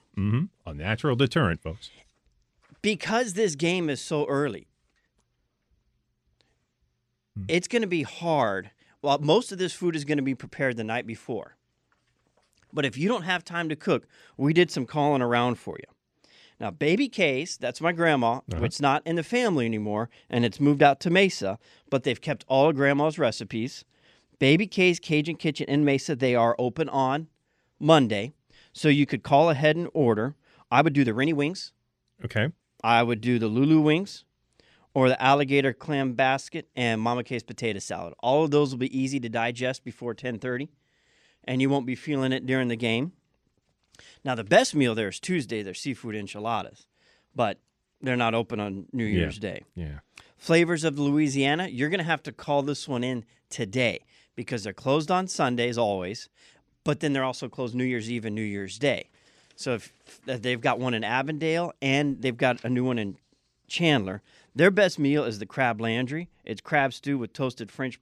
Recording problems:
uneven, jittery; strongly; from 7.5 s to 1:01

